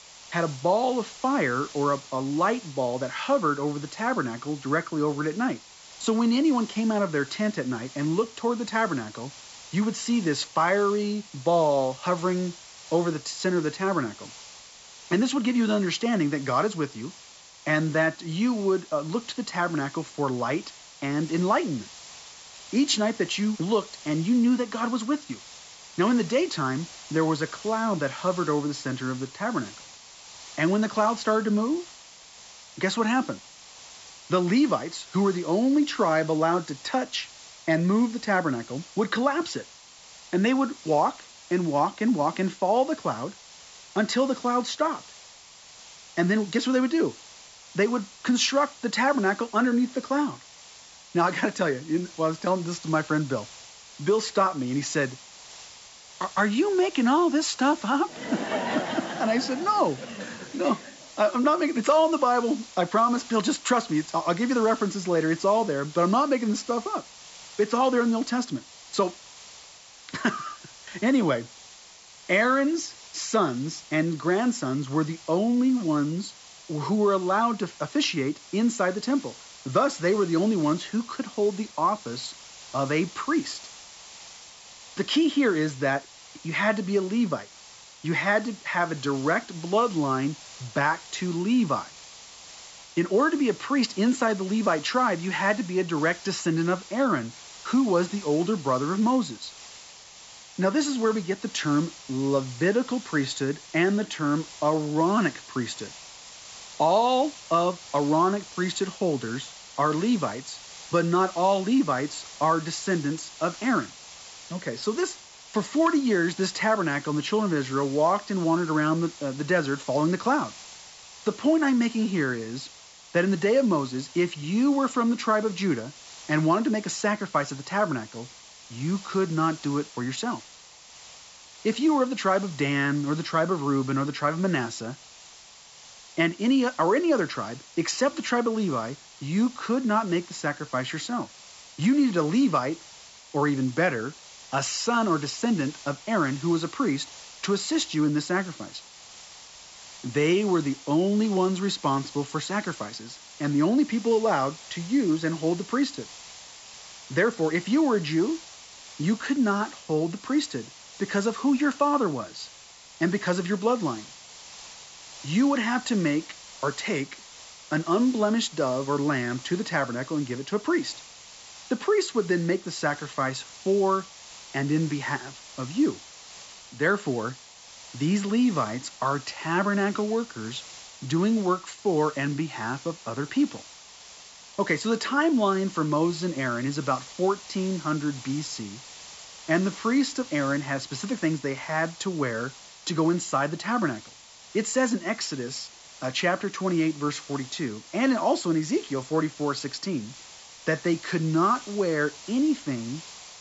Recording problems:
high frequencies cut off; noticeable; nothing above 8 kHz
hiss; noticeable; throughout; 20 dB below the speech

